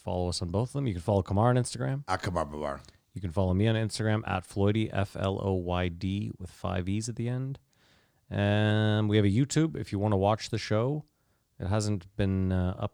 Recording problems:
none

